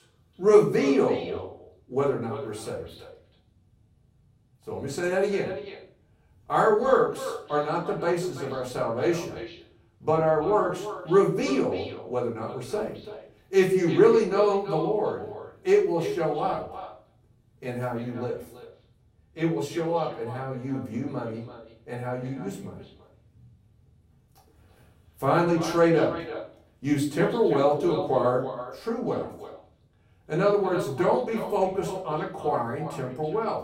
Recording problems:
off-mic speech; far
echo of what is said; noticeable; throughout; 330 ms later, 15 dB below the speech
room echo; slight; dies away in 0.4 s

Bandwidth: 16 kHz